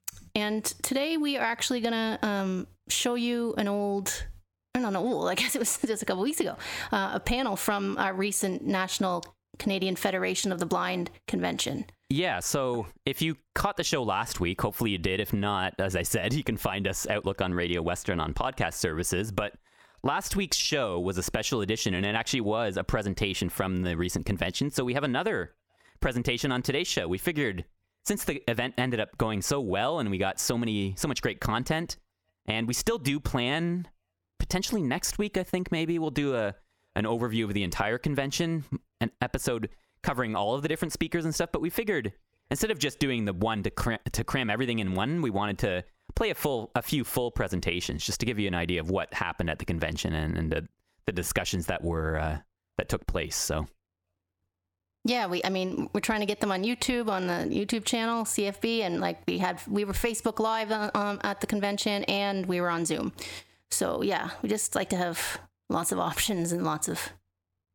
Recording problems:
squashed, flat; heavily

